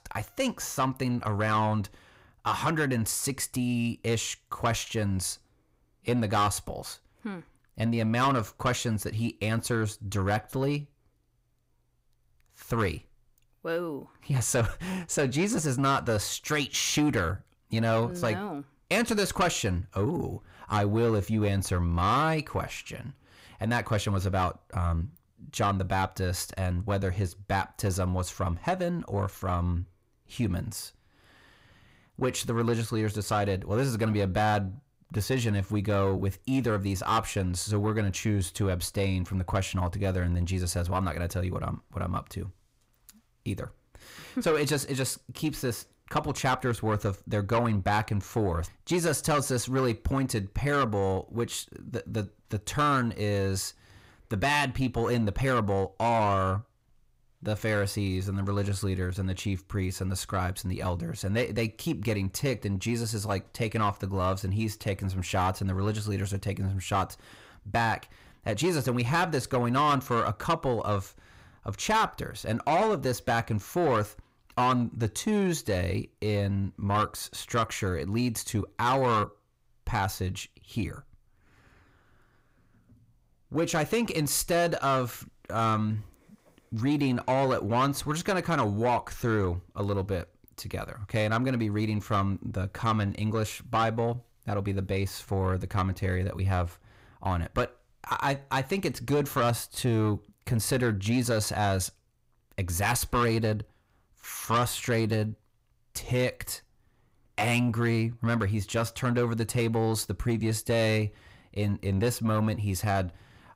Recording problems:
distortion; slight; 10 dB below the speech

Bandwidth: 15.5 kHz